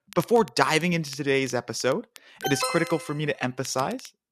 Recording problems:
crackle, like an old record; faint; 25 dB below the speech
alarm; noticeable; at 2.5 s; peak 3 dB below the speech

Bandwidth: 13.5 kHz